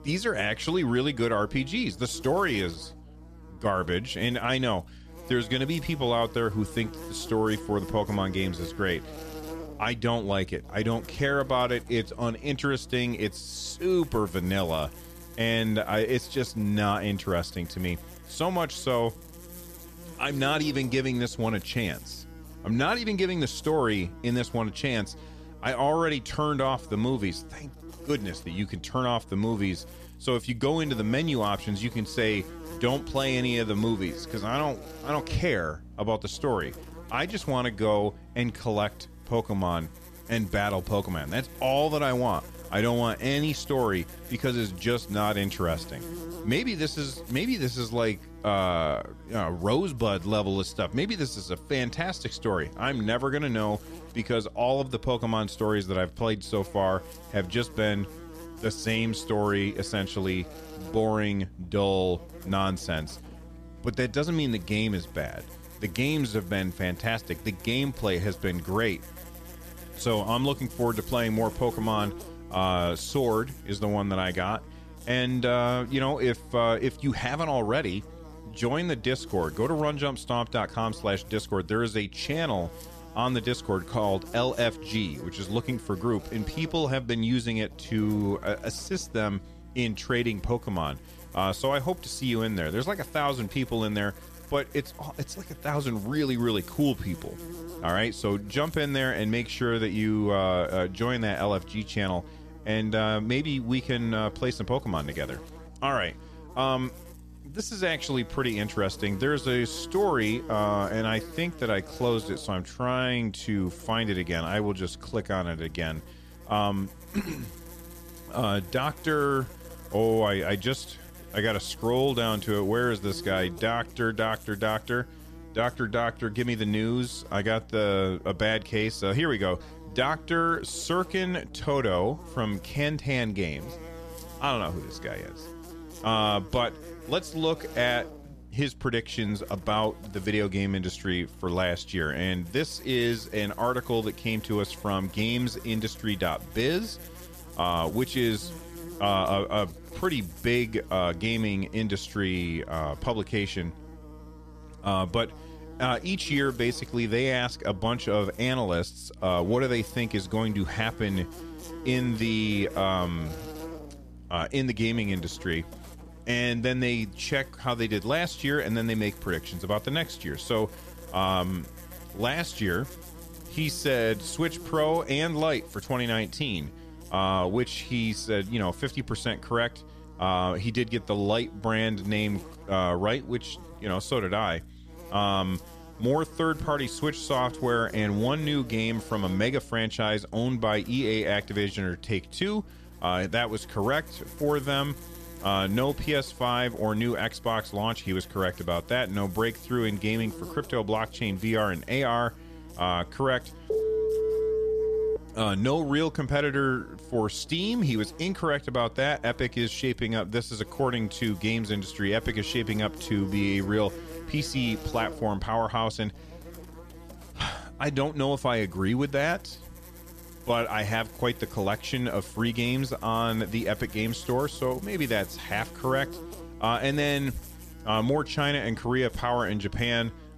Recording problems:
electrical hum; noticeable; throughout; 60 Hz, 20 dB below the speech
phone ringing; loud; from 3:24 to 3:25; peak 2 dB above the speech

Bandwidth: 14.5 kHz